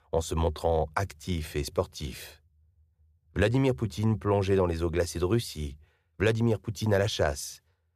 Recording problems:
none

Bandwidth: 14.5 kHz